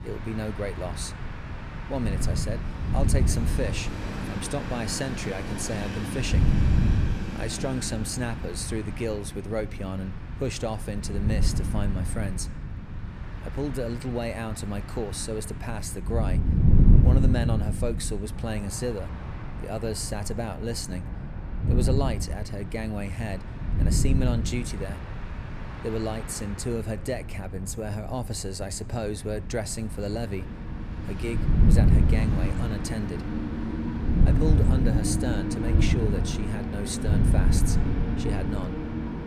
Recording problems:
wind noise on the microphone; heavy; 6 dB below the speech
train or aircraft noise; loud; throughout; 5 dB below the speech

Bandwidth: 14.5 kHz